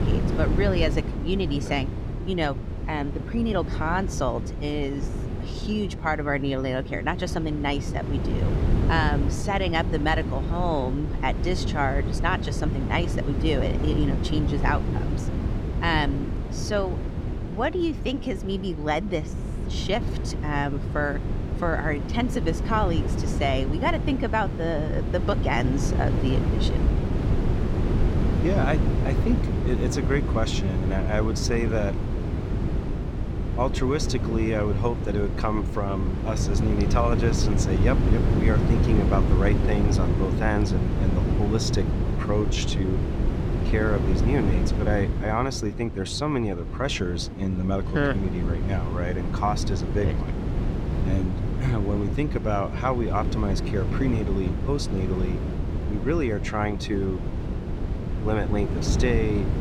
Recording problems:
wind noise on the microphone; heavy; 7 dB below the speech

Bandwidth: 17 kHz